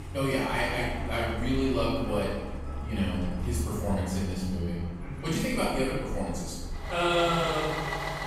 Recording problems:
room echo; strong; dies away in 1.1 s
off-mic speech; far
traffic noise; loud; throughout; 7 dB below the speech

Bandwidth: 15.5 kHz